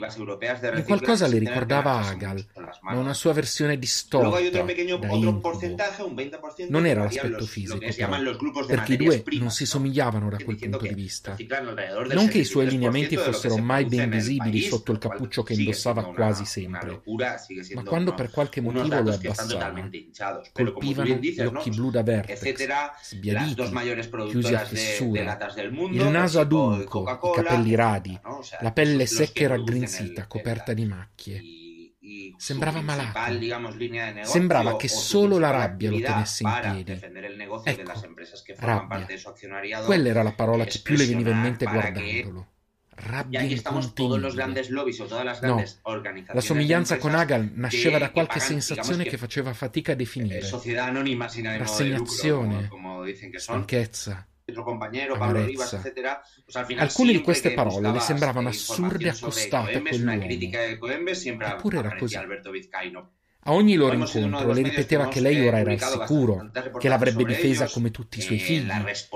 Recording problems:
voice in the background; loud; throughout; 5 dB below the speech

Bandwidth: 15 kHz